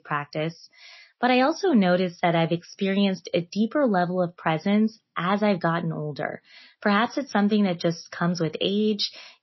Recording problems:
garbled, watery; slightly; nothing above 5.5 kHz

